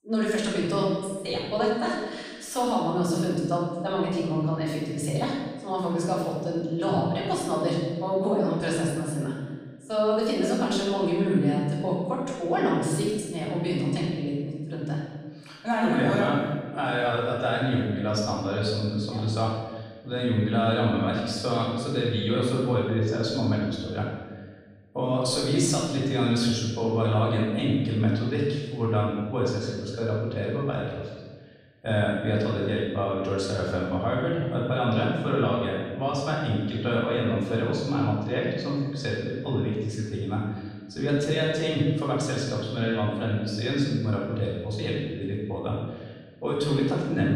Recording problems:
room echo; strong; dies away in 1.3 s
off-mic speech; far
abrupt cut into speech; at the end

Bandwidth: 15 kHz